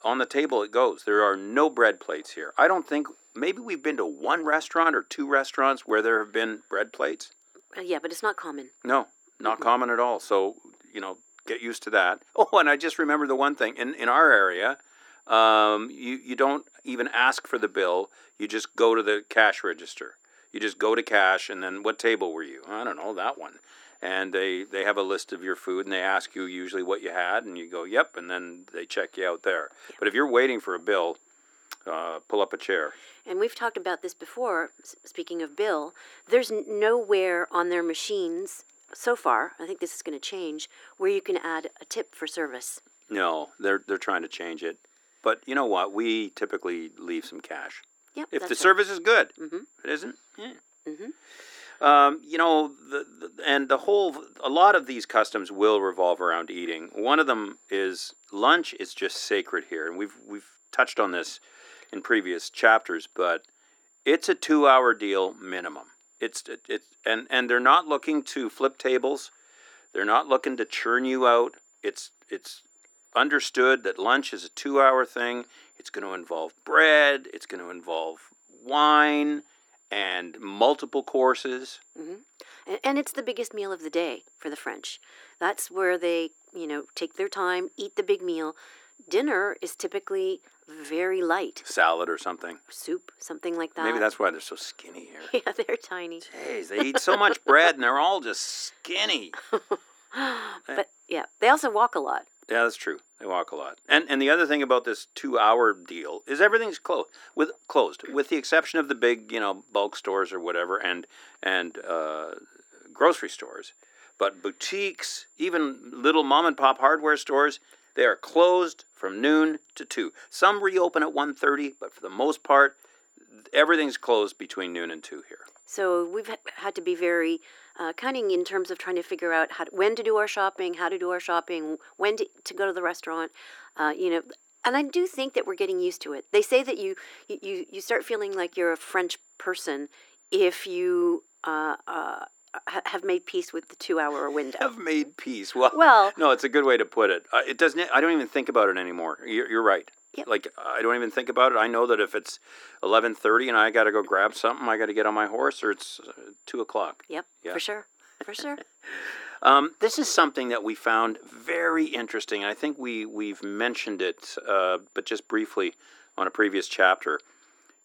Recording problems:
thin; somewhat; fading below 300 Hz
muffled; very slightly; fading above 3.5 kHz
high-pitched whine; faint; throughout; 7 kHz, 35 dB below the speech

